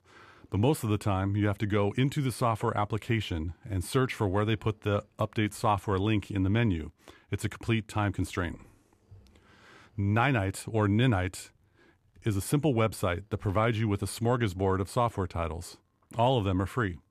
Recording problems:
none

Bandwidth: 14.5 kHz